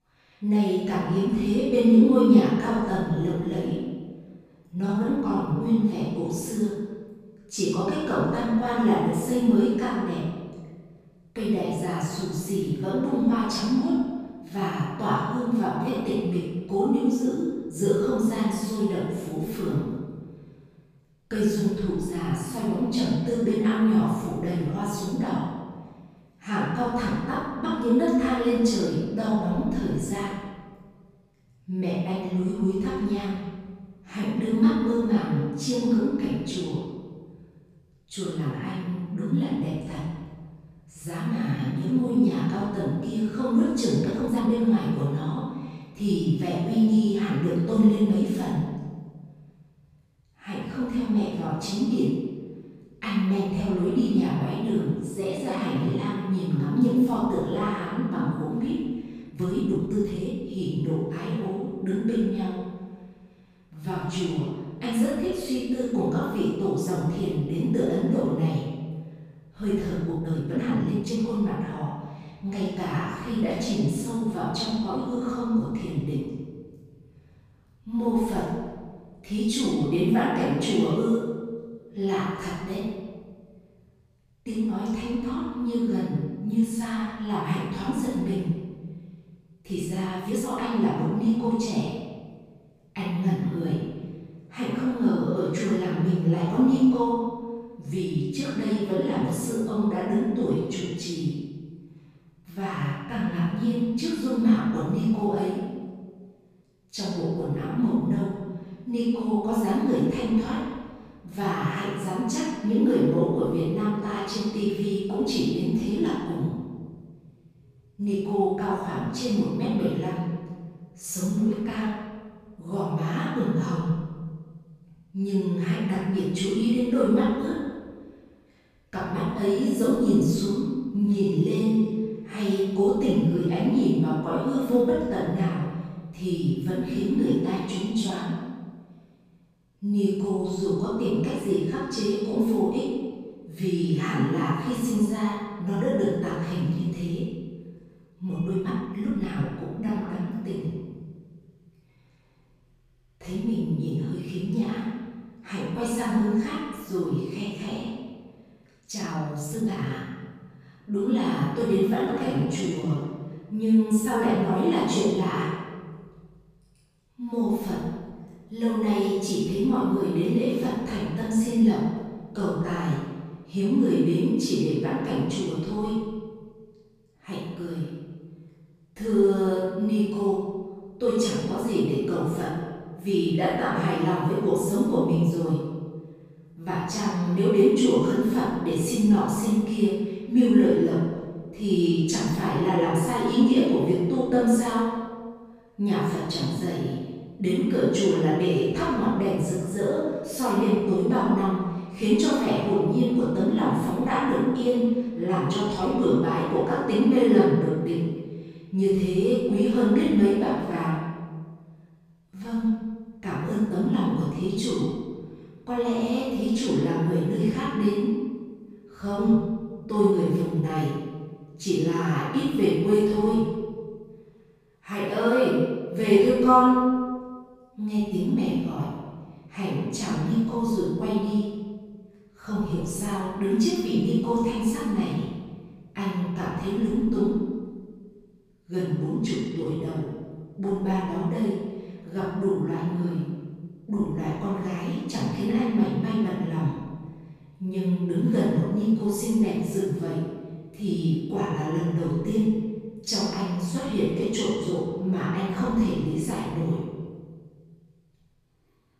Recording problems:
room echo; strong; dies away in 1.5 s
off-mic speech; far
uneven, jittery; strongly; from 4.5 s to 4:00

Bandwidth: 14.5 kHz